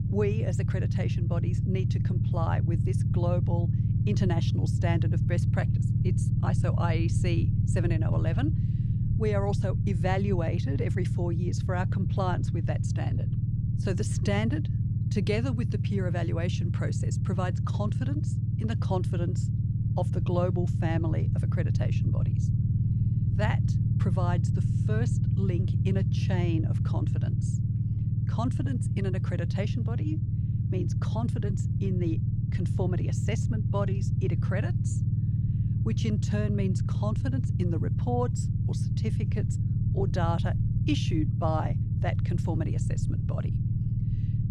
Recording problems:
low rumble; loud; throughout; 4 dB below the speech

